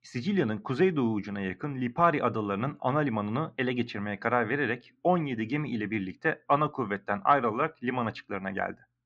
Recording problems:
muffled; slightly; fading above 3.5 kHz

